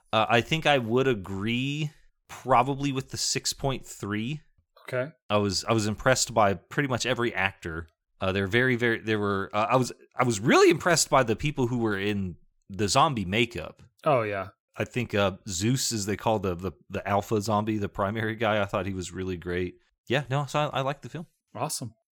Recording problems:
none

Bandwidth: 18 kHz